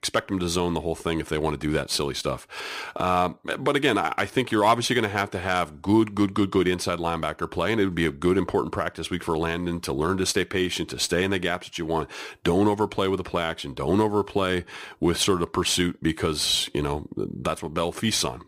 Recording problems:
none

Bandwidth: 15.5 kHz